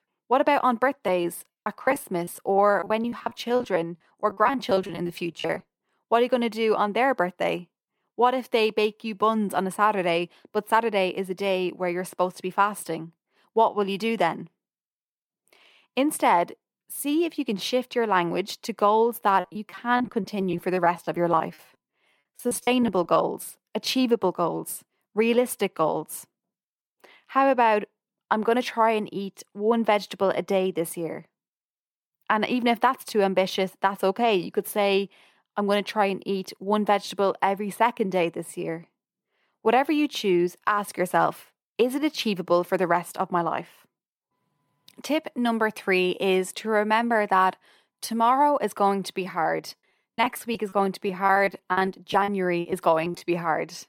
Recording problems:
choppy; very; from 1 to 5.5 s, from 19 to 23 s and from 50 to 53 s; 18% of the speech affected

